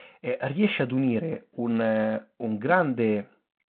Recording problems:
phone-call audio

